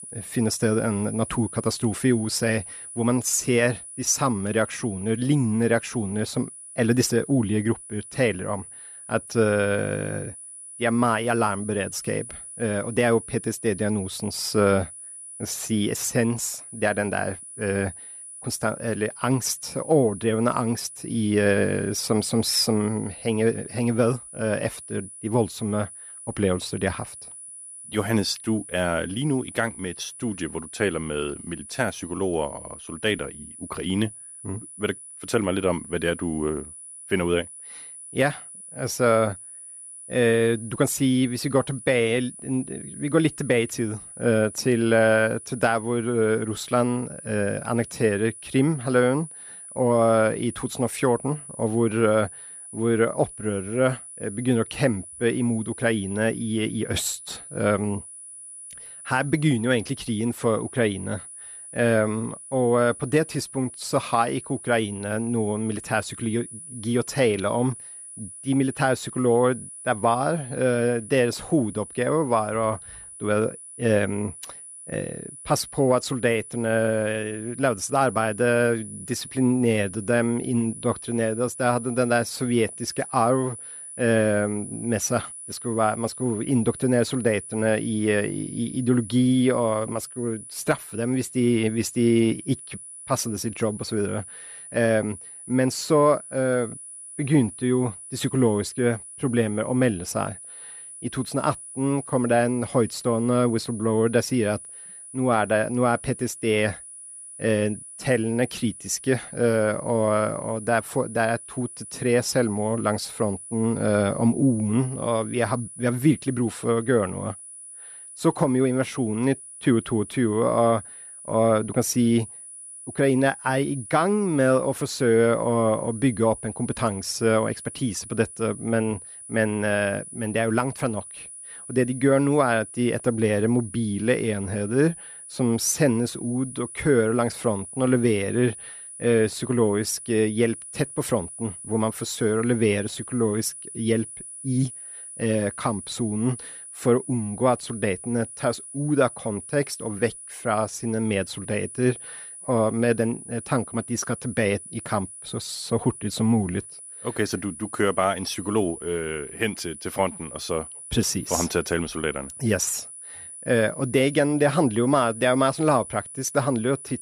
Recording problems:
high-pitched whine; noticeable; throughout; 10 kHz, 15 dB below the speech

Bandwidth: 14.5 kHz